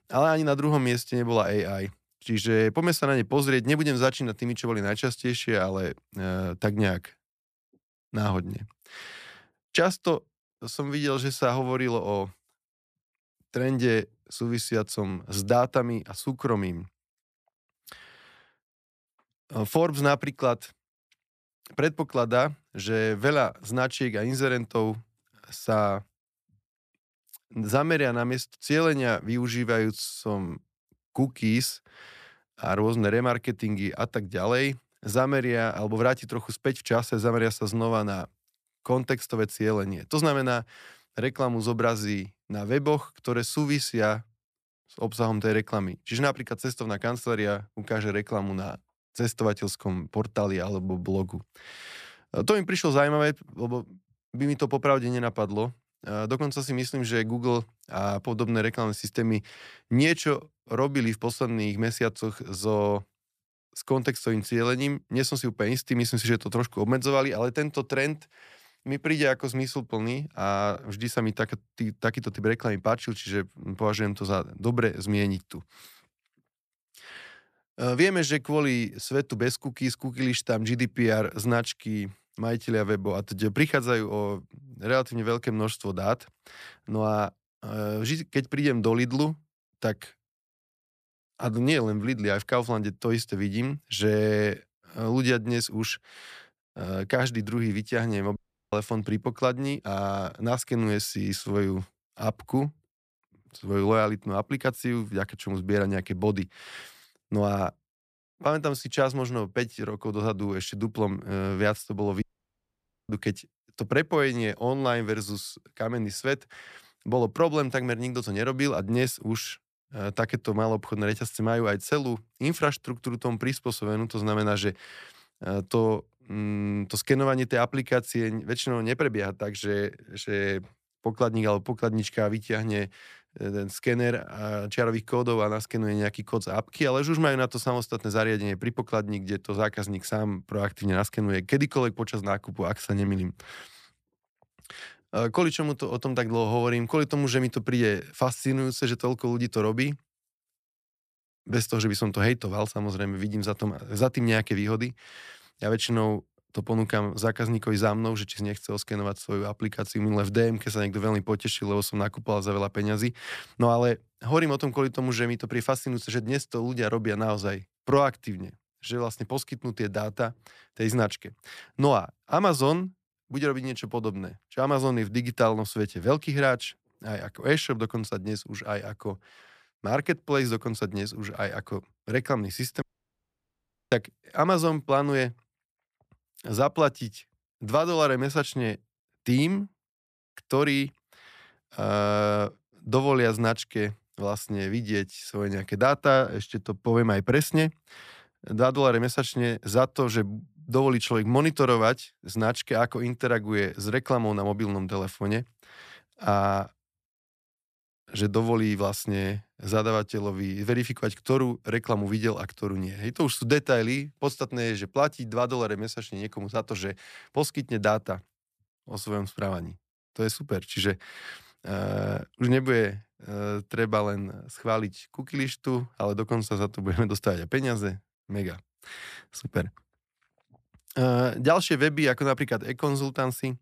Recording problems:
audio cutting out; at 1:38, at 1:52 for 1 s and at 3:03 for 1 s

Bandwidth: 14.5 kHz